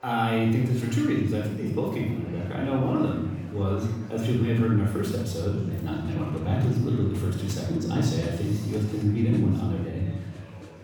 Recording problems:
off-mic speech; far
room echo; noticeable; dies away in 1 s
murmuring crowd; faint; throughout; 20 dB below the speech

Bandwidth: 19 kHz